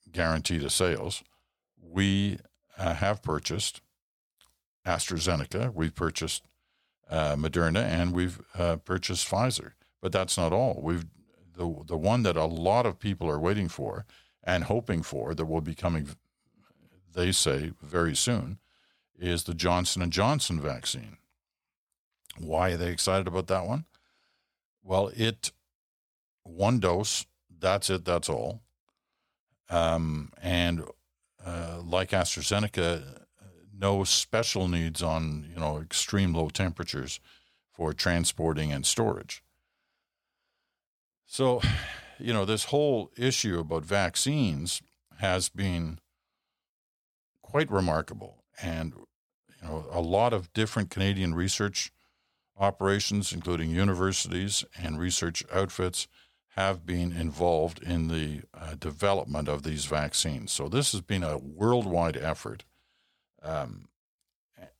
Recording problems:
none

